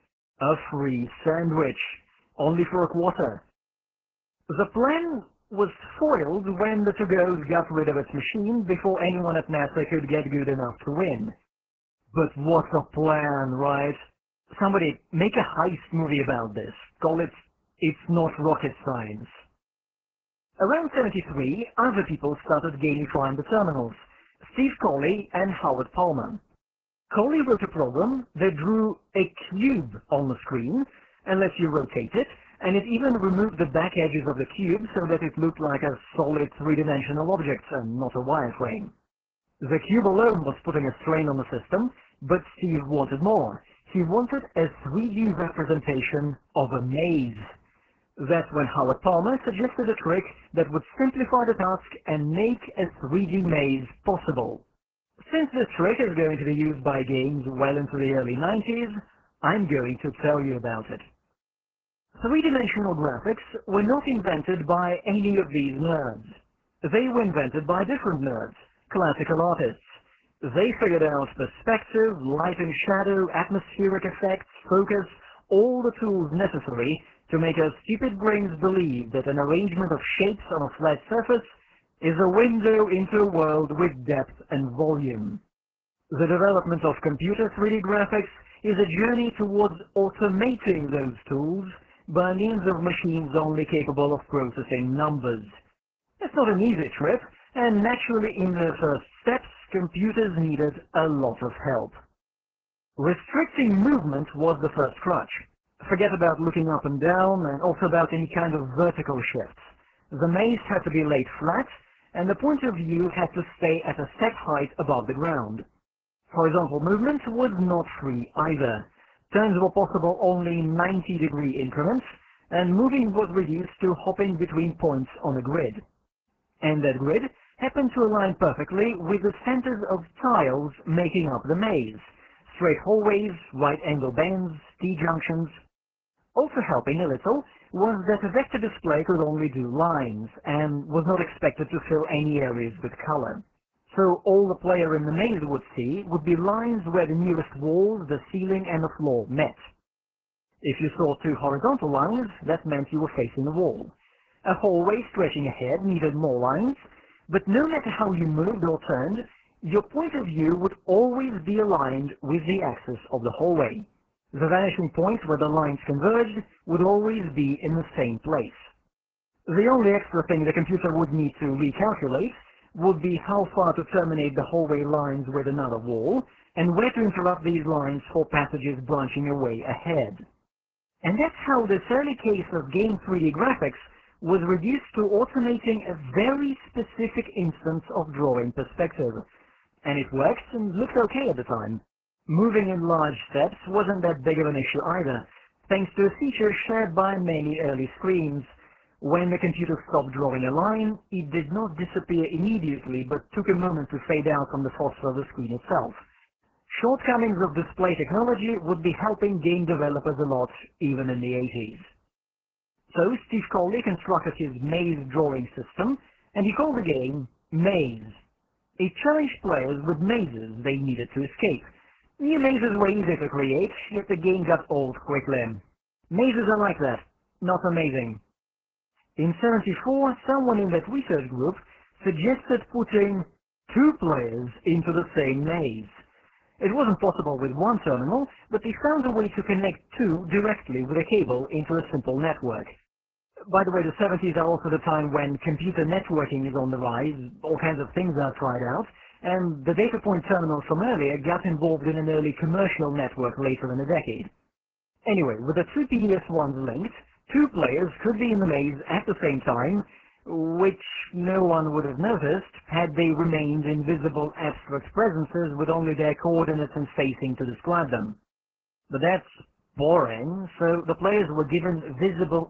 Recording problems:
garbled, watery; badly

